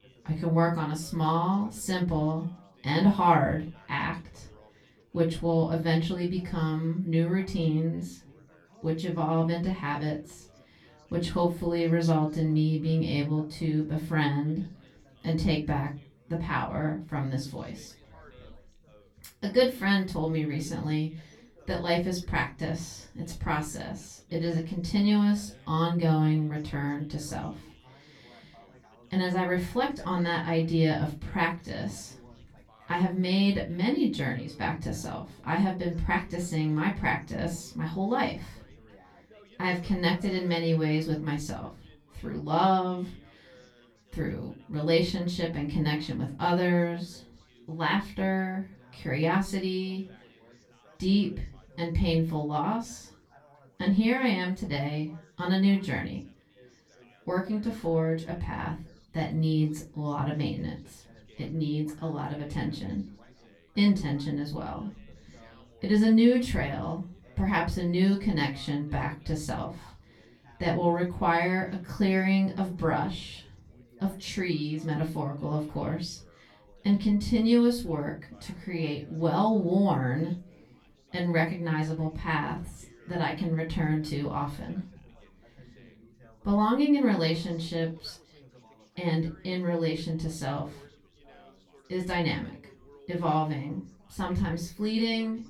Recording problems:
off-mic speech; far
room echo; very slight; dies away in 0.3 s
background chatter; faint; throughout; 4 voices, 30 dB below the speech

